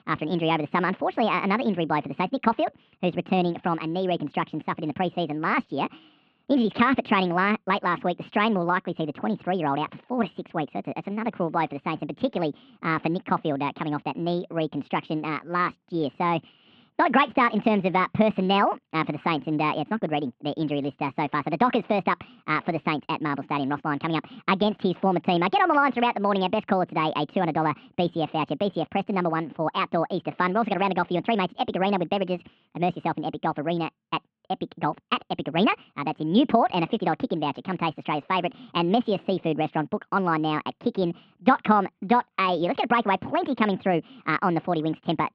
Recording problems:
muffled; very; fading above 3 kHz
wrong speed and pitch; too fast and too high; 1.5 times normal speed

